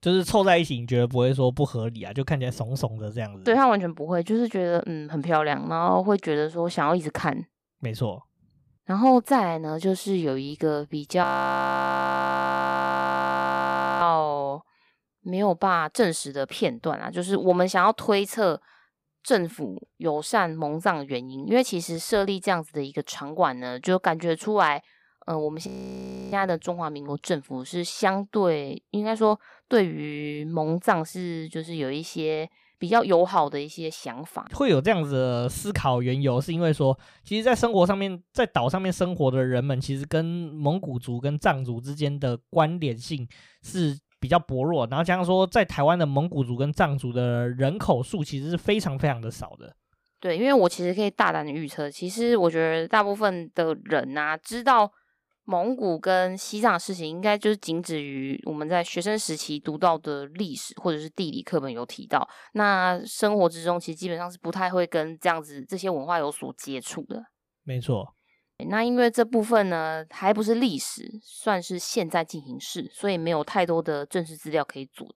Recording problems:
audio freezing; at 11 s for 3 s and at 26 s for 0.5 s

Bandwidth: 15 kHz